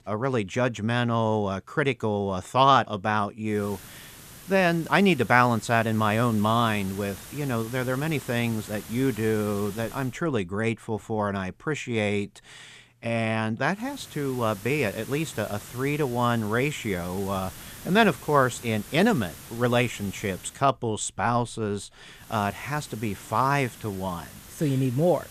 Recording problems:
hiss; noticeable; from 3.5 to 10 s, from 14 to 21 s and from 22 s on; 15 dB below the speech

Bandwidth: 14.5 kHz